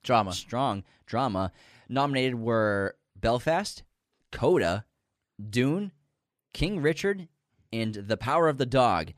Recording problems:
none

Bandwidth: 14.5 kHz